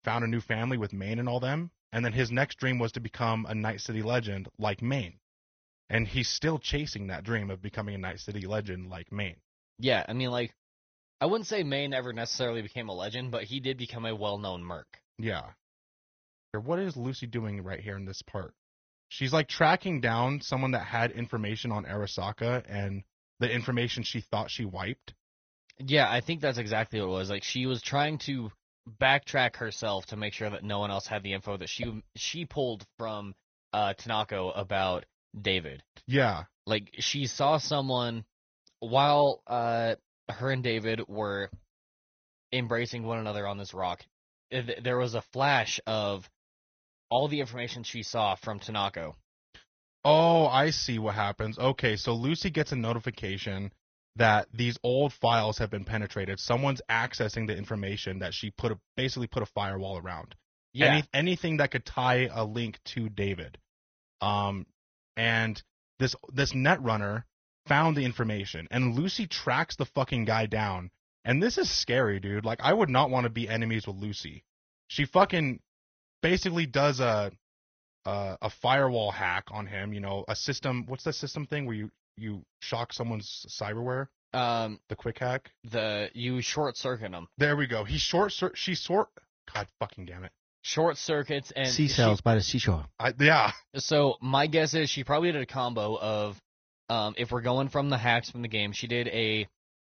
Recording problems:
garbled, watery; slightly; nothing above 6.5 kHz

